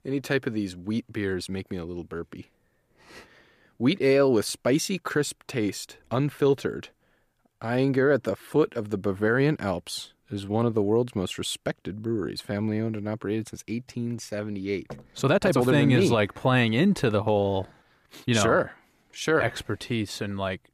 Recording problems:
uneven, jittery; strongly; from 1.5 to 20 s

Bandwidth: 15 kHz